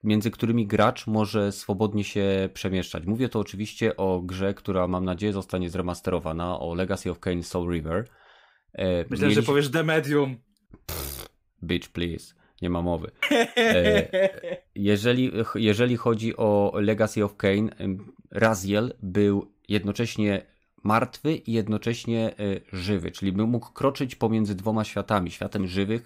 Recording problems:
none

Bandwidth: 15.5 kHz